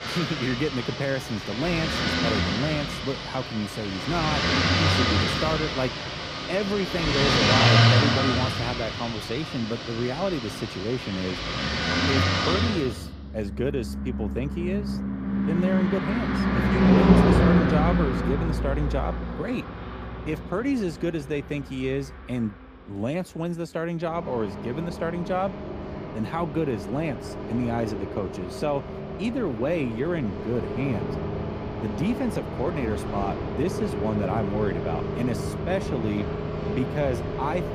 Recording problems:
traffic noise; very loud; throughout; 3 dB above the speech

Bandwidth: 15 kHz